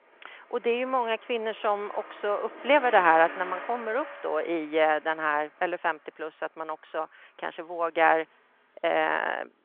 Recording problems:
phone-call audio
traffic noise; noticeable; throughout; 15 dB below the speech

